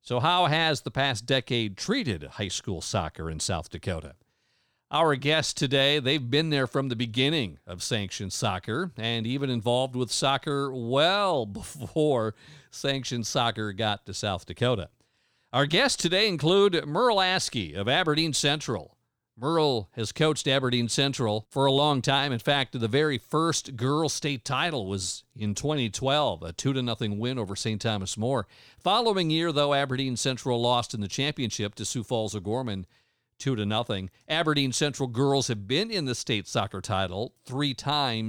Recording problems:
abrupt cut into speech; at the end

